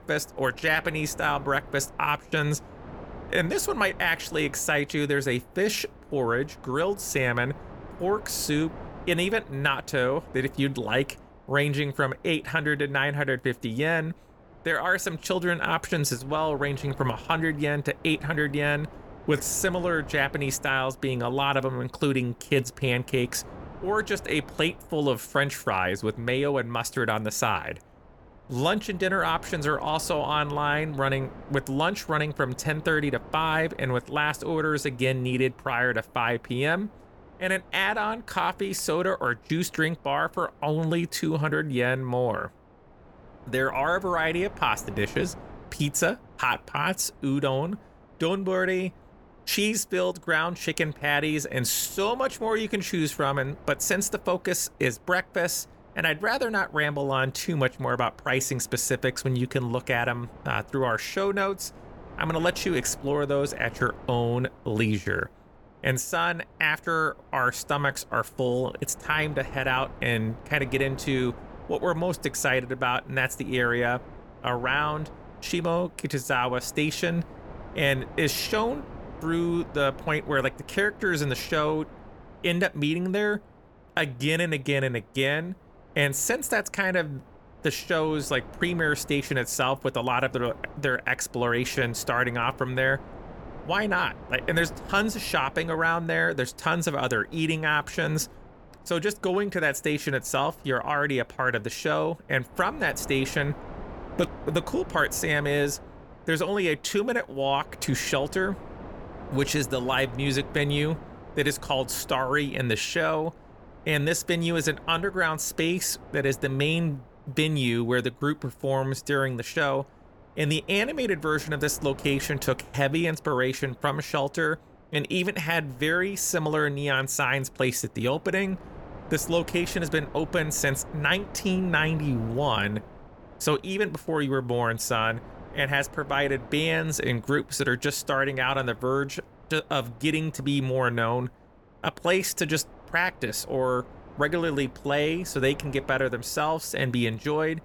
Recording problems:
wind noise on the microphone; occasional gusts; 20 dB below the speech

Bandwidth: 18 kHz